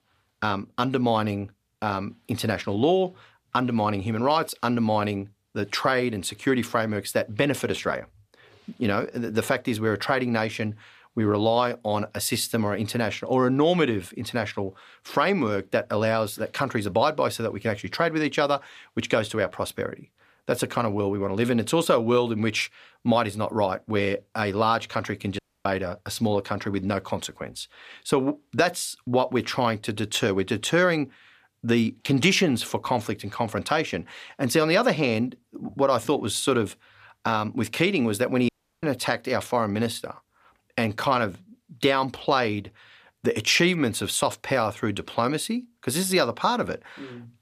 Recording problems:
audio cutting out; at 25 s and at 38 s

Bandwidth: 14.5 kHz